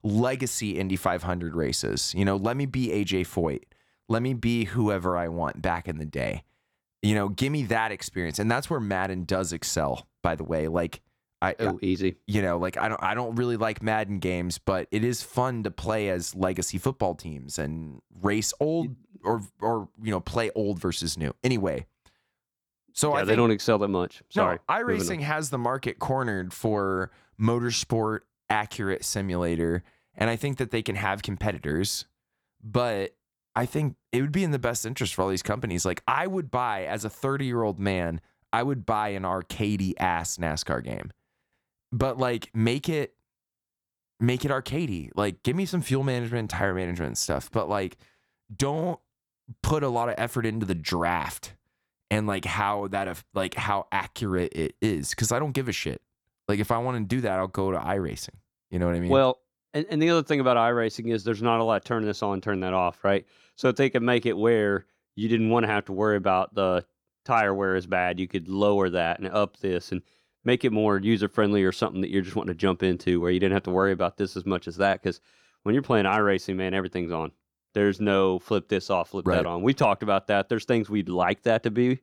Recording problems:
none

